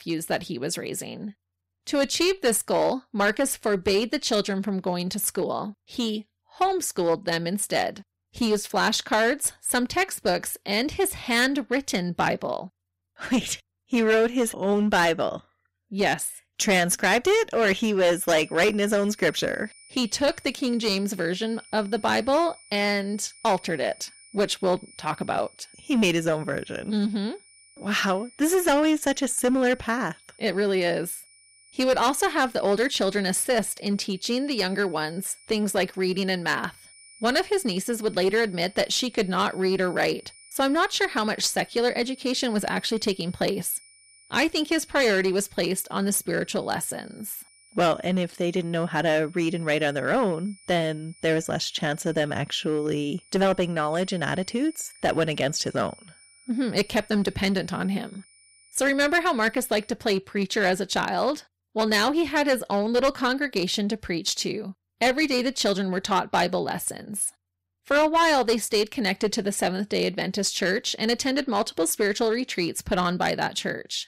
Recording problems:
distortion; slight; 6% of the sound clipped
high-pitched whine; faint; from 18 s to 1:00; 9.5 kHz, 25 dB below the speech

